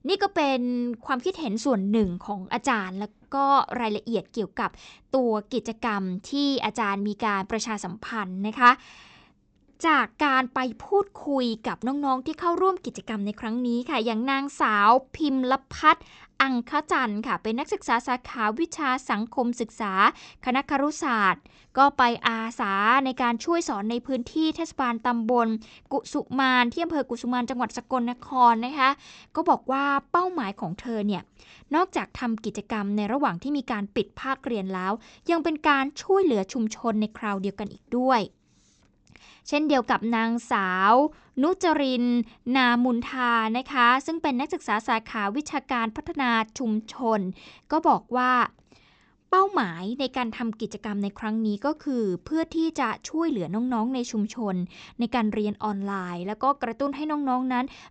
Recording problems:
high frequencies cut off; noticeable; nothing above 8 kHz

